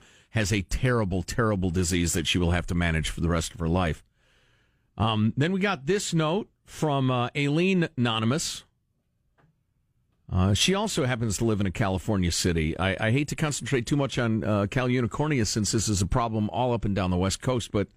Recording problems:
none

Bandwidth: 15 kHz